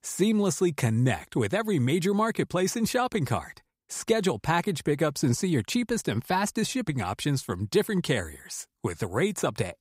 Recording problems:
none

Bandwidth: 15.5 kHz